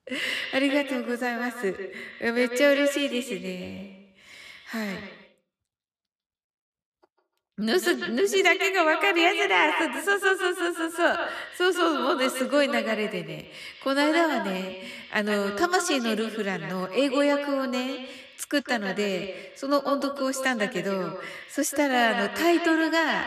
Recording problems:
echo of what is said; strong; throughout; 150 ms later, 7 dB below the speech

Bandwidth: 14 kHz